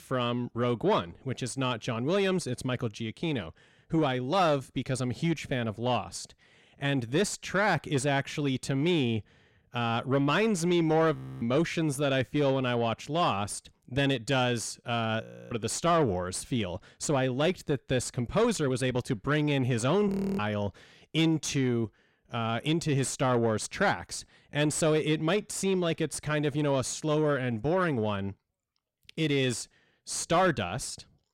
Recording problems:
distortion; slight; 10 dB below the speech
audio freezing; at 11 s, at 15 s and at 20 s

